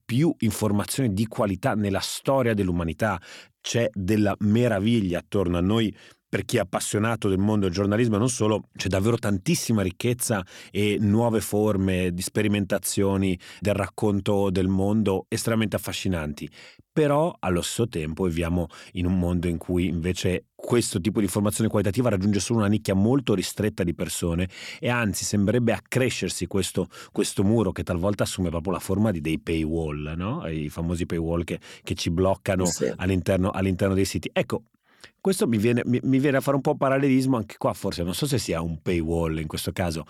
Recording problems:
none

